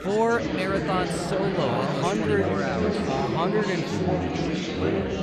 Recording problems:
chatter from many people; very loud; throughout; 1 dB above the speech

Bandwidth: 15.5 kHz